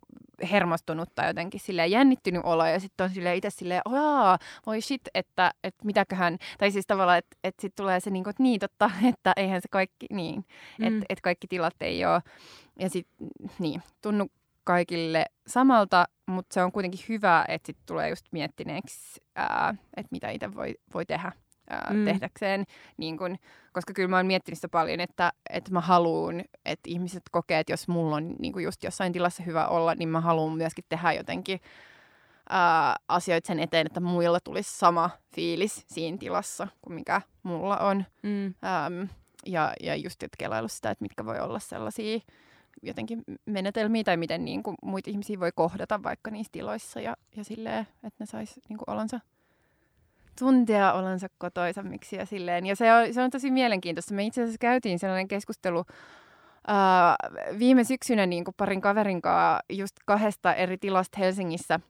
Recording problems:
none

